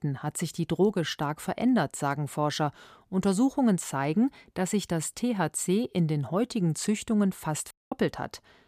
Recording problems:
audio cutting out; at 7.5 s

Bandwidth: 15 kHz